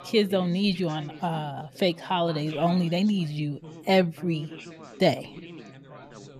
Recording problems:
background chatter; noticeable; throughout; 4 voices, 15 dB below the speech

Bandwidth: 14.5 kHz